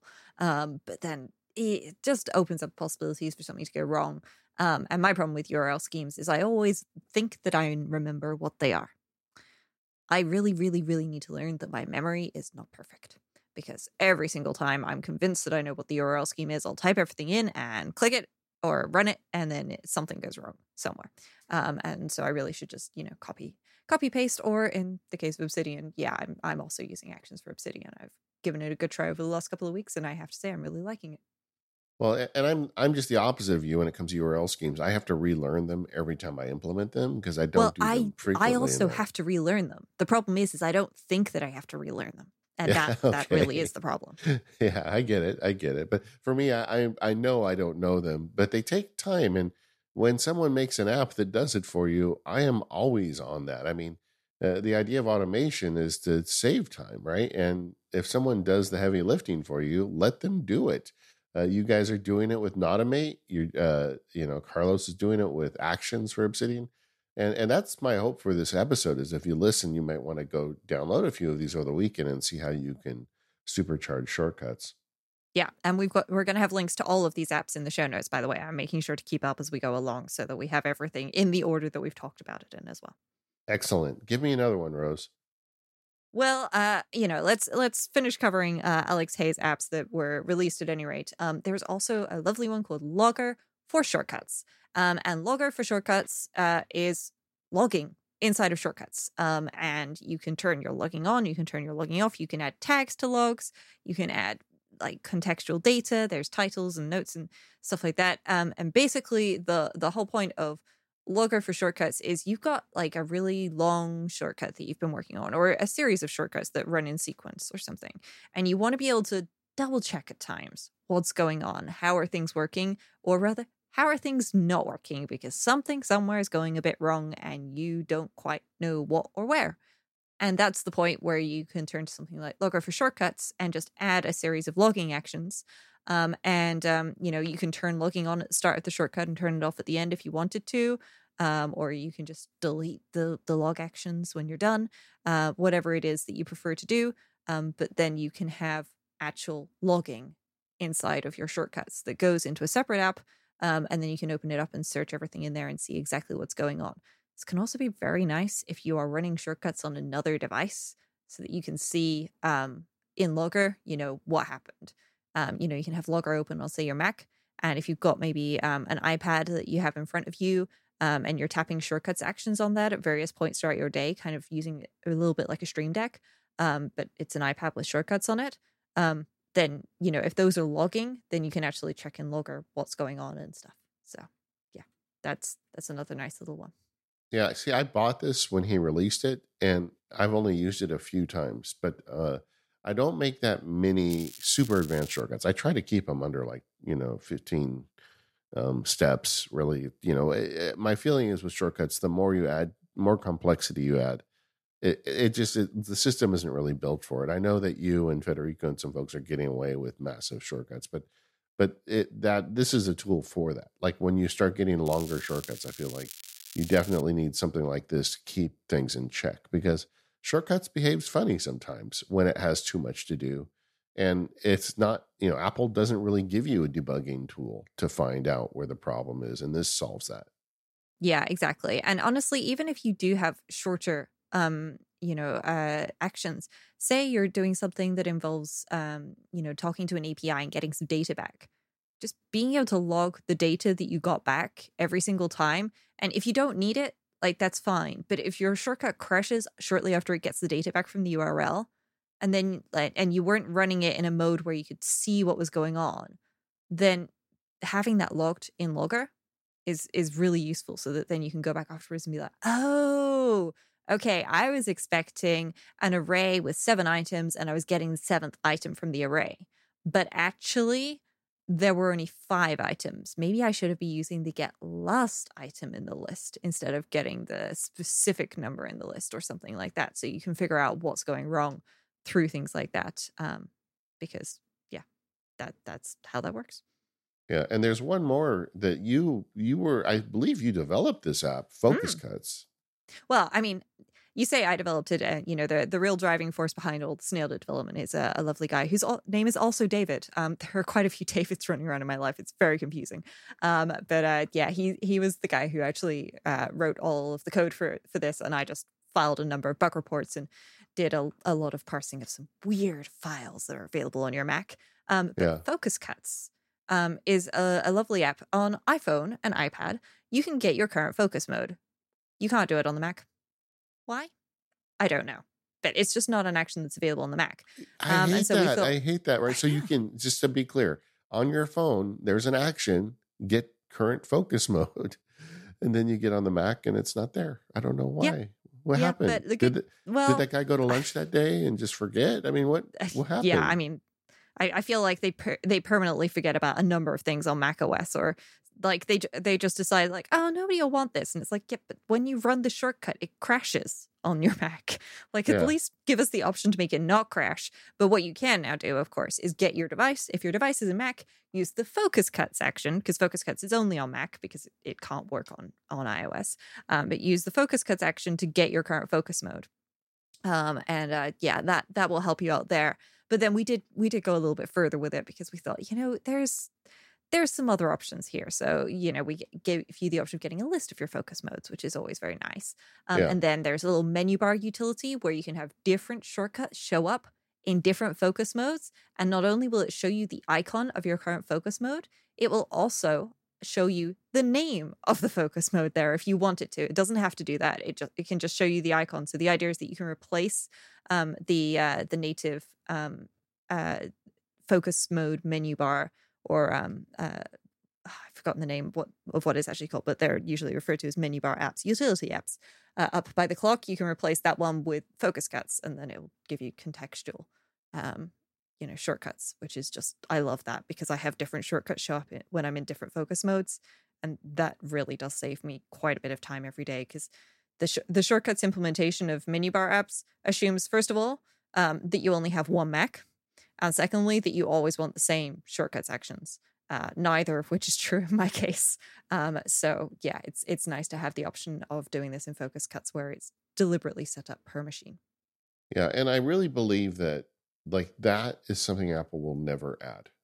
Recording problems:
crackling; noticeable; from 3:14 to 3:15 and from 3:35 to 3:37; 15 dB below the speech

